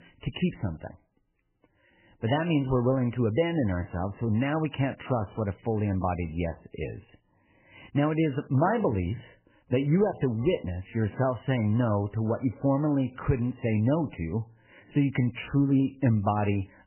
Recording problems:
garbled, watery; badly; nothing above 3 kHz

